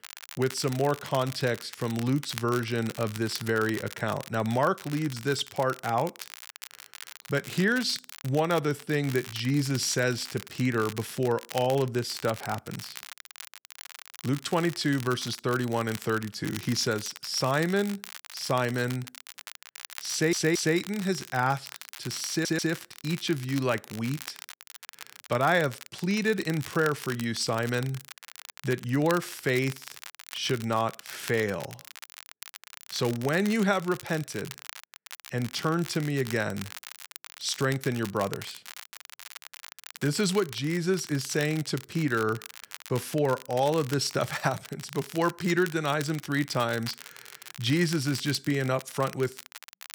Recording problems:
crackle, like an old record; noticeable; 15 dB below the speech
audio stuttering; at 20 s and at 22 s

